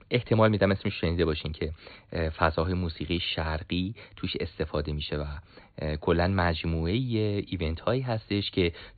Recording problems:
high frequencies cut off; severe; nothing above 4.5 kHz

